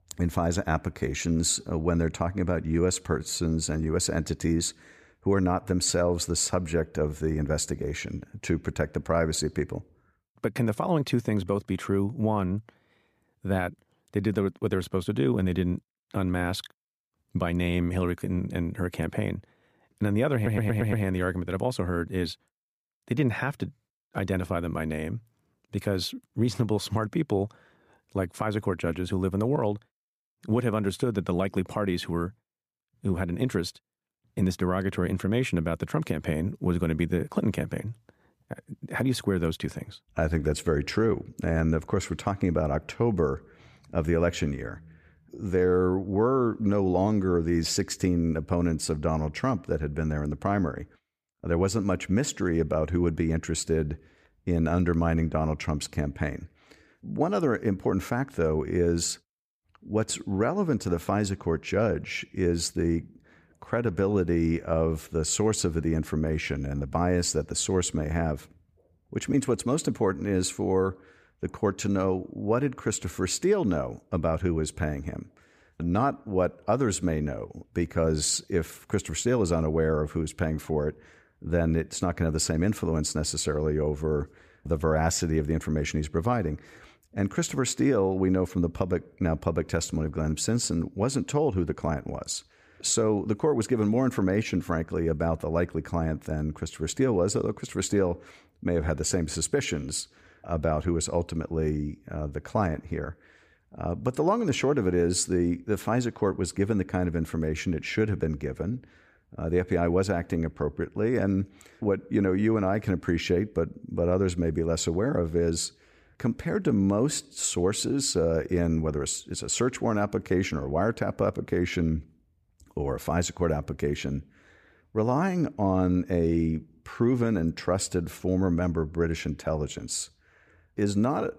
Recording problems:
audio stuttering; at 20 s

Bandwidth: 15 kHz